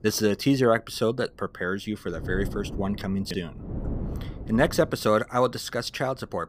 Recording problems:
wind noise on the microphone; occasional gusts; 15 dB below the speech

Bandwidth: 15 kHz